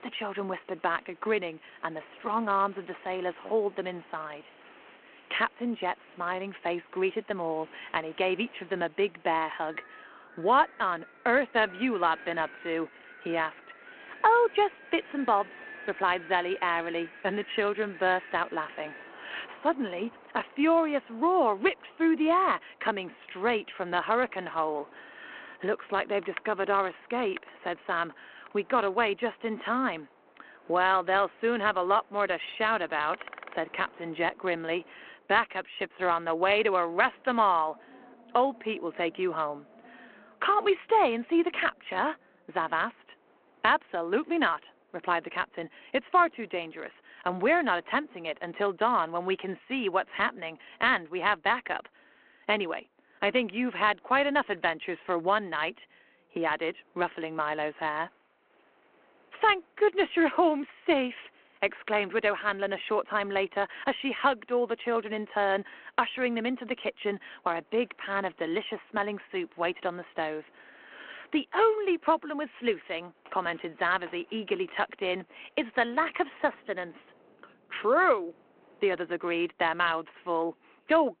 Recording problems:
phone-call audio
wind in the background; faint; throughout; 20 dB below the speech

